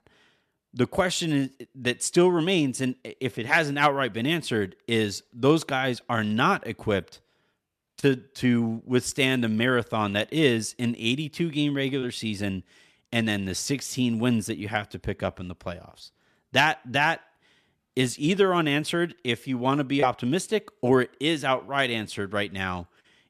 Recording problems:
none

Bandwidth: 14 kHz